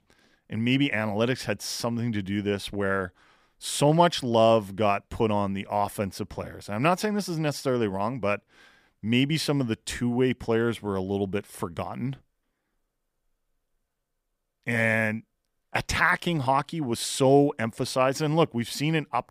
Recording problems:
none

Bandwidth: 15 kHz